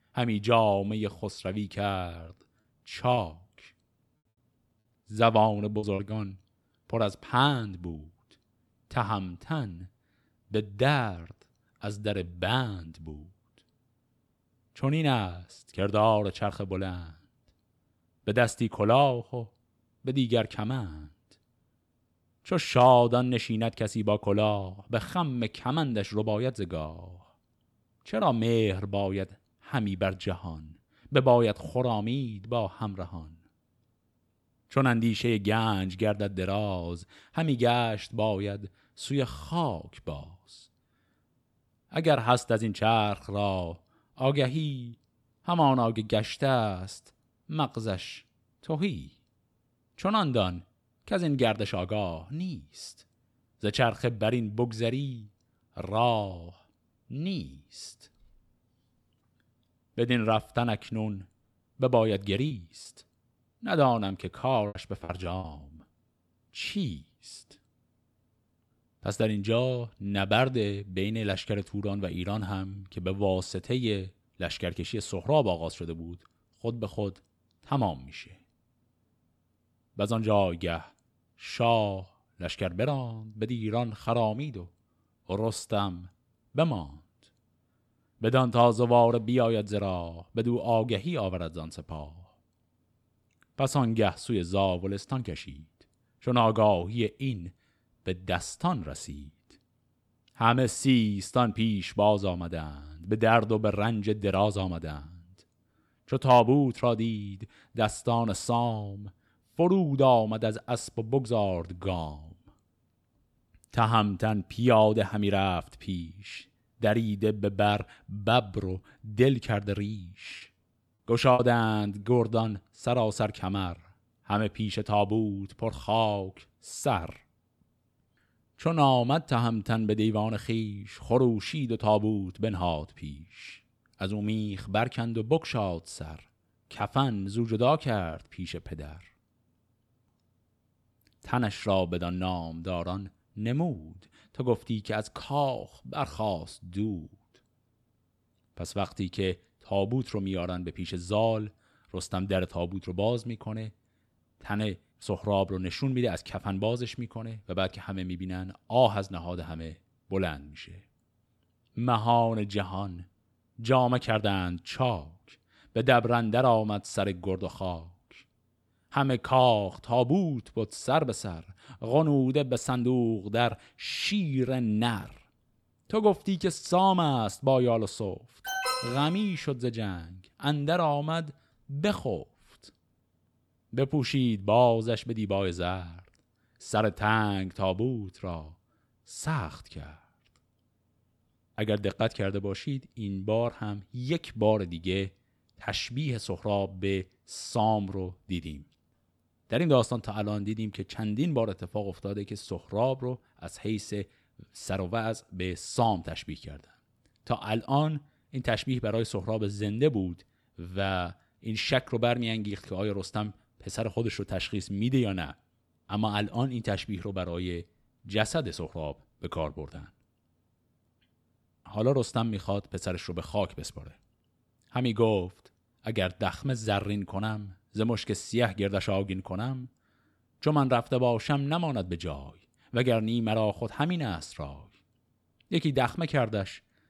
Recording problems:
choppy; very; from 2.5 to 6 s, from 1:02 to 1:05 and from 2:00 to 2:01; 10% of the speech affected
alarm; noticeable; at 2:58; peak 1 dB below the speech

